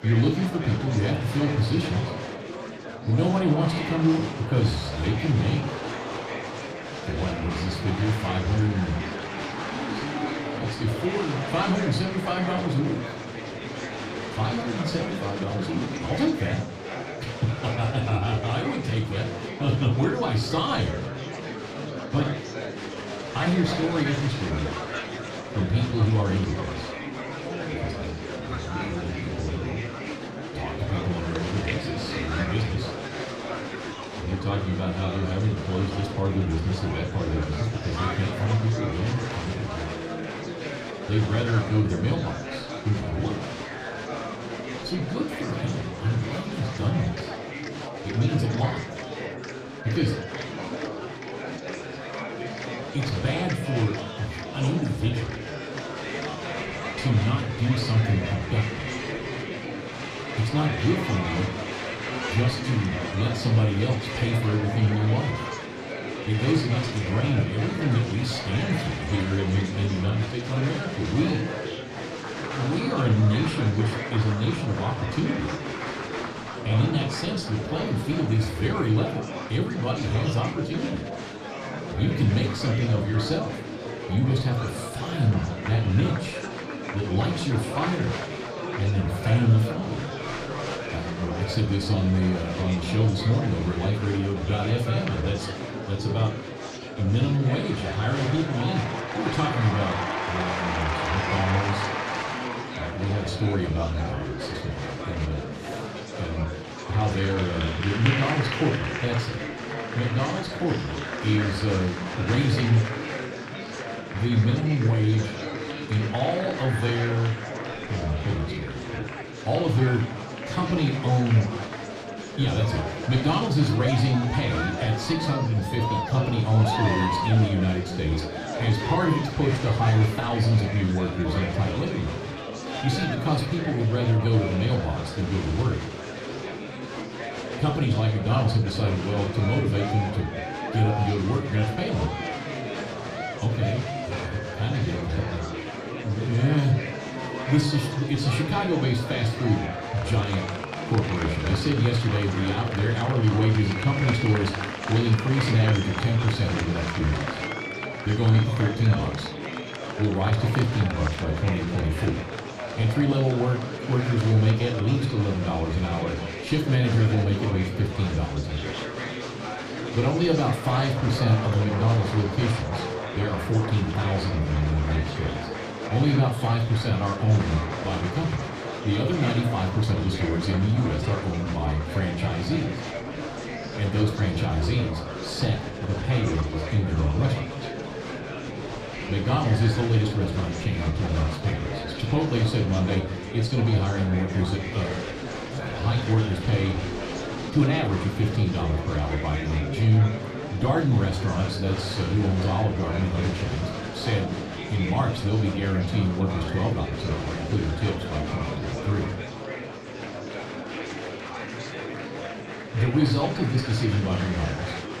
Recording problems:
off-mic speech; far
room echo; slight; dies away in 0.3 s
murmuring crowd; loud; throughout; 7 dB below the speech

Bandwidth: 14.5 kHz